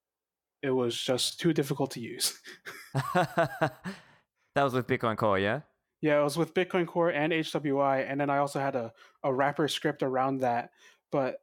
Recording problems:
none

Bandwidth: 17 kHz